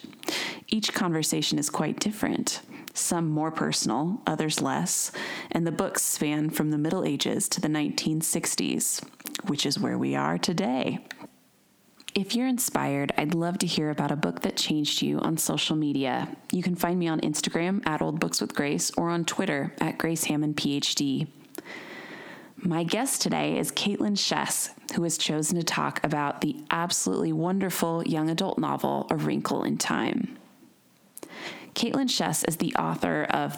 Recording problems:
squashed, flat; heavily

